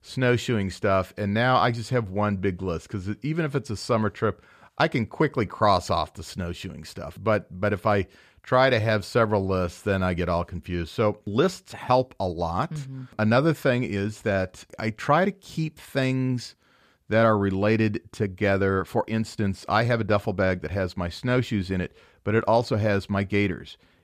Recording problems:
none

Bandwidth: 14.5 kHz